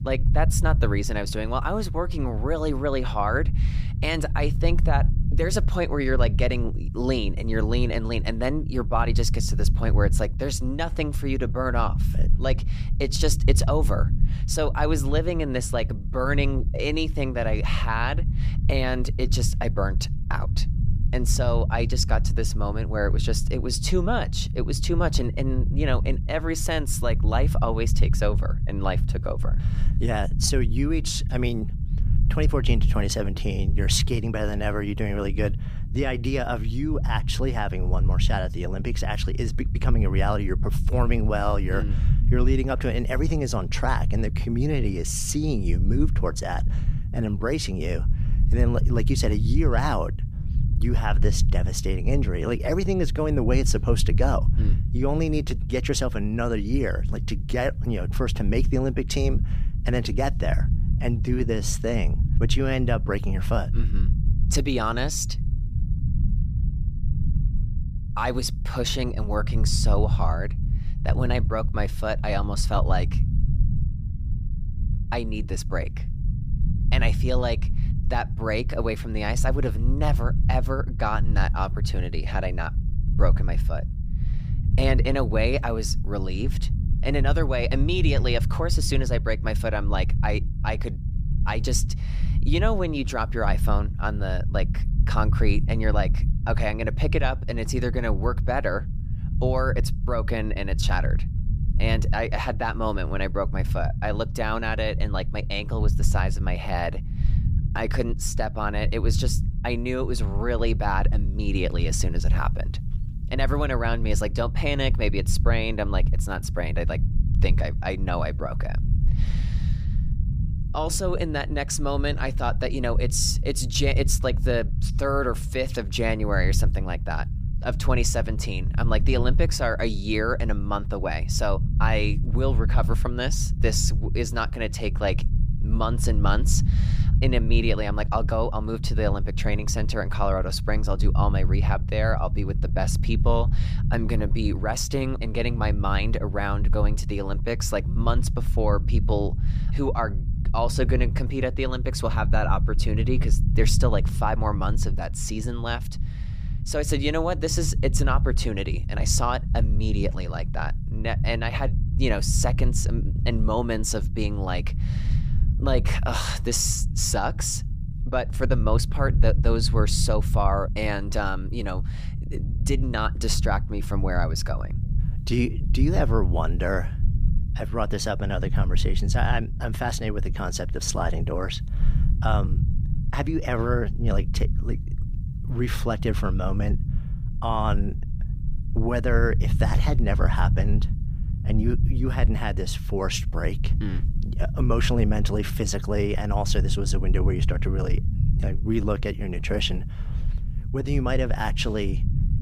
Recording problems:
low rumble; noticeable; throughout; 15 dB below the speech

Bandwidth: 15 kHz